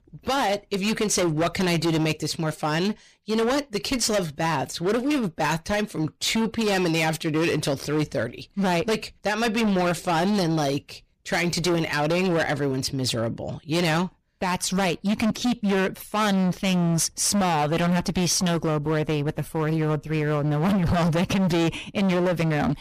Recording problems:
distortion; heavy; 23% of the sound clipped

